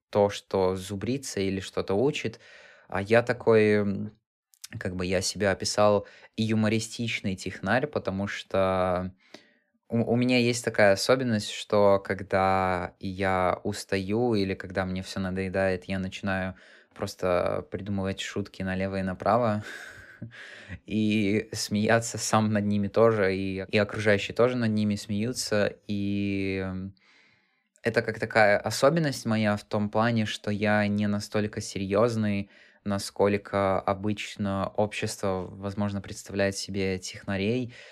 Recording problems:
none

